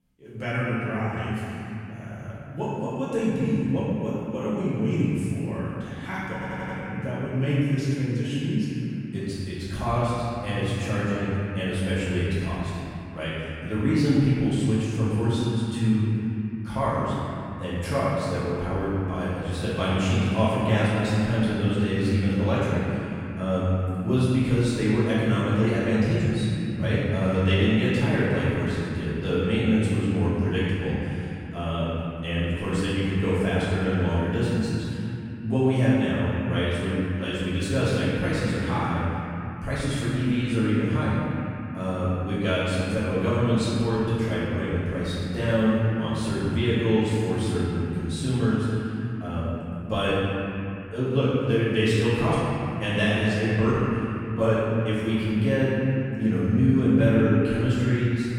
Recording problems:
room echo; strong; dies away in 3 s
off-mic speech; far
audio stuttering; at 6.5 s

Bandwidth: 16 kHz